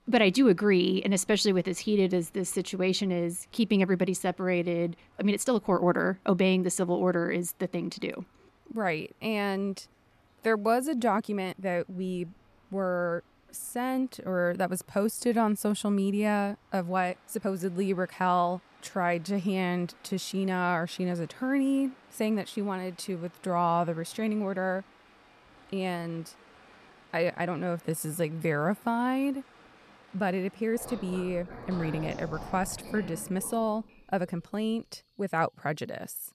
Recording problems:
rain or running water; faint; throughout; 20 dB below the speech
uneven, jittery; strongly; from 3.5 to 34 s

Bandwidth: 14 kHz